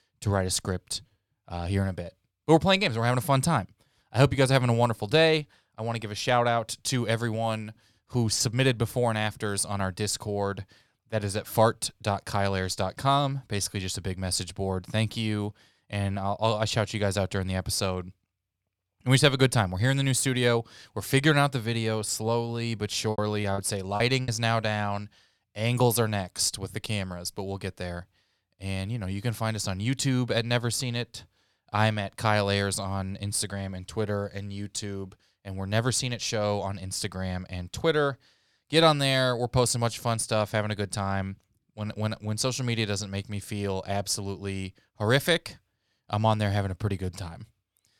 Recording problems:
choppy; very; from 23 to 24 s; 12% of the speech affected

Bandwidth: 18 kHz